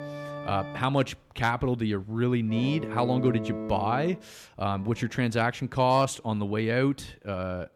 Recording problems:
background music; loud; throughout; 10 dB below the speech

